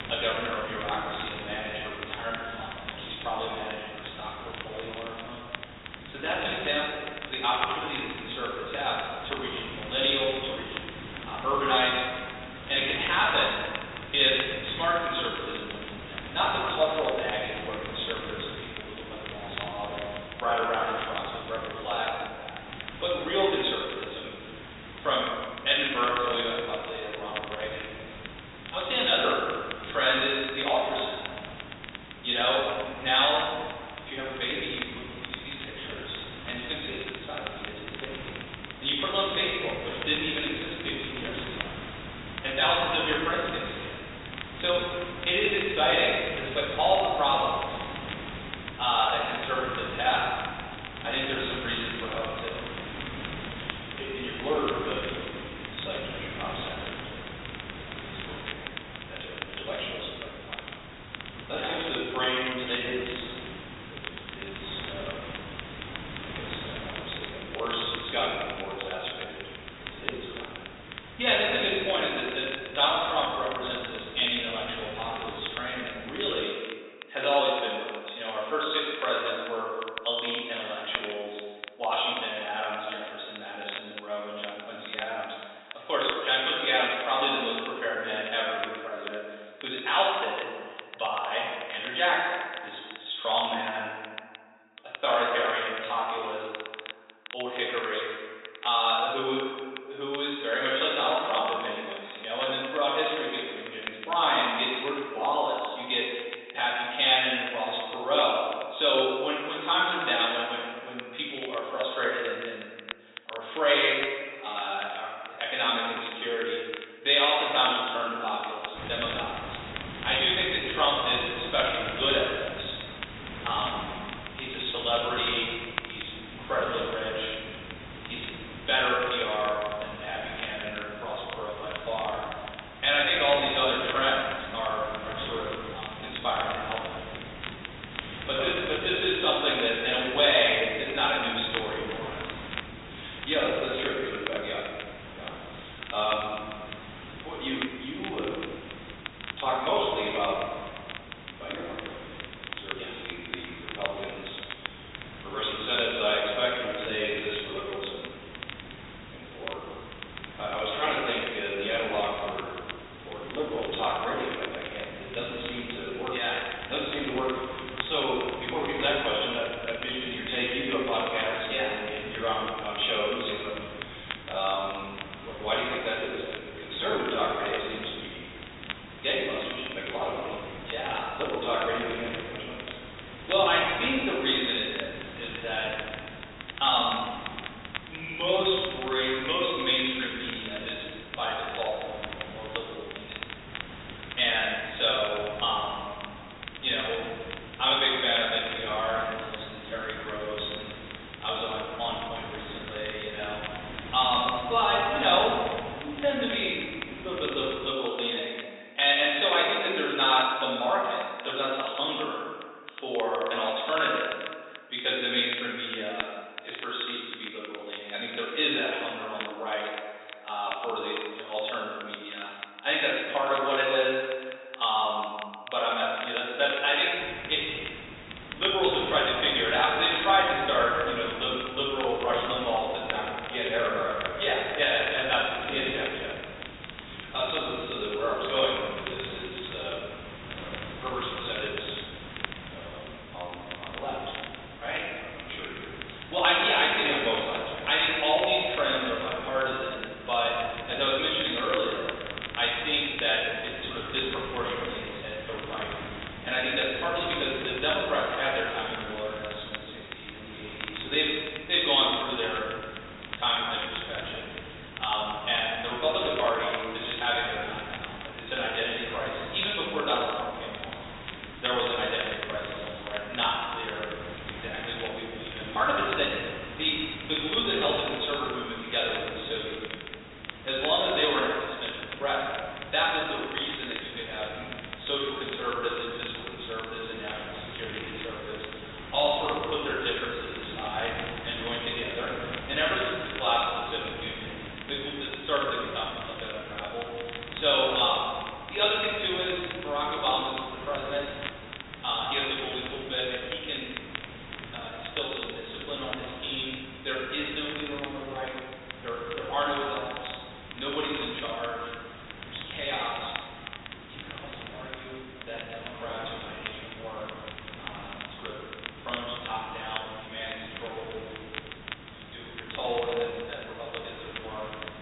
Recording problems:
off-mic speech; far
high frequencies cut off; severe; nothing above 4 kHz
room echo; noticeable; dies away in 1.6 s
thin; somewhat; fading below 400 Hz
hiss; noticeable; until 1:16, from 1:59 to 3:28 and from 3:47 on; 15 dB below the speech
crackle, like an old record; noticeable; 15 dB below the speech

